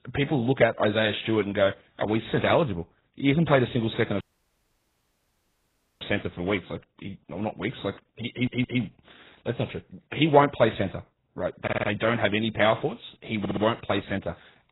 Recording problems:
garbled, watery; badly; nothing above 4 kHz
audio cutting out; at 4 s for 2 s
audio stuttering; at 8.5 s, at 12 s and at 13 s

